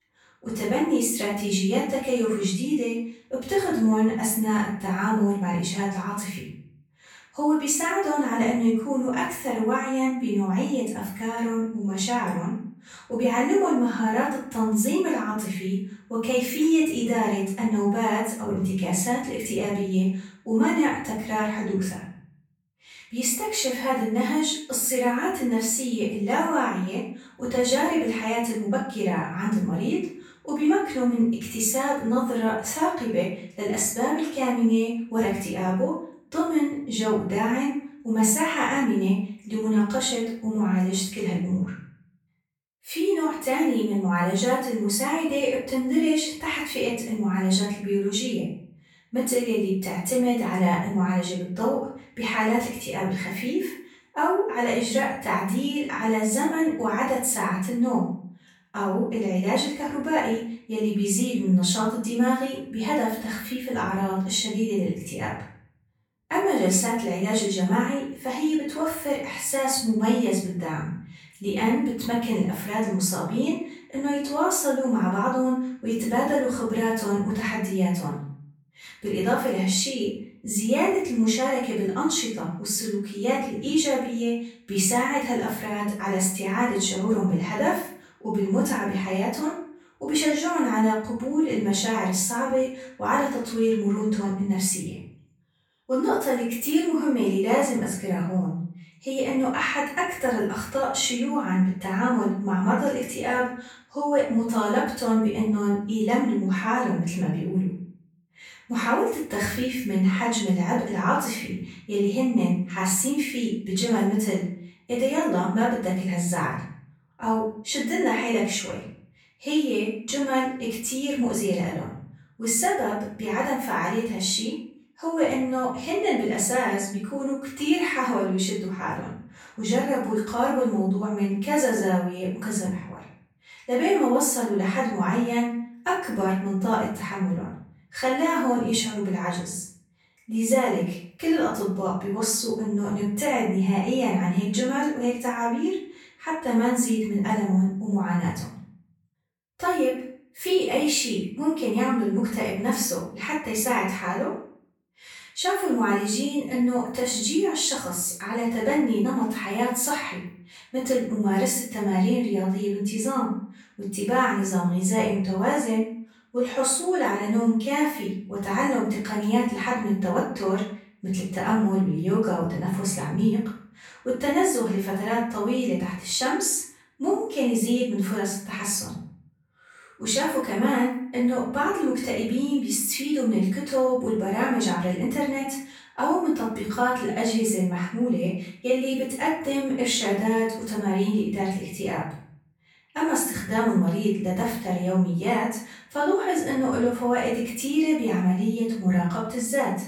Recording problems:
off-mic speech; far
room echo; noticeable; dies away in 0.5 s

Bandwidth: 17 kHz